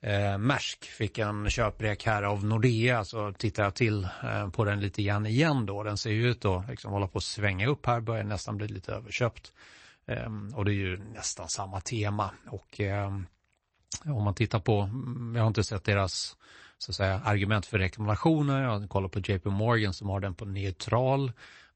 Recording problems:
garbled, watery; slightly; nothing above 8 kHz

